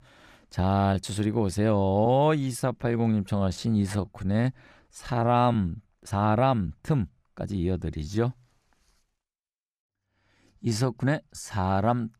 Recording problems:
uneven, jittery; strongly; from 0.5 to 12 s

